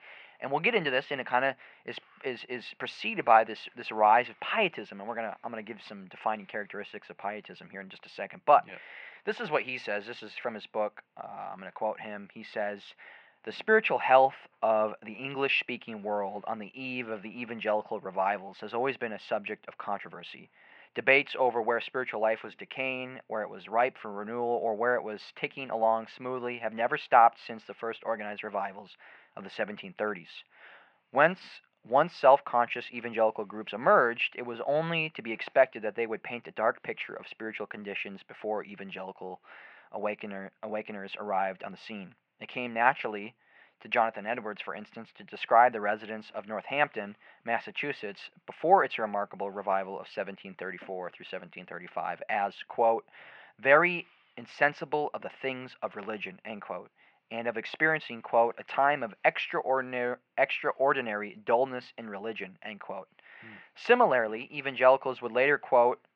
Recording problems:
muffled; very; fading above 2.5 kHz
thin; very; fading below 650 Hz

